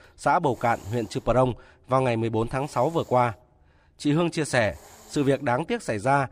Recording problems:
hiss; faint; throughout; 25 dB below the speech

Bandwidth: 15 kHz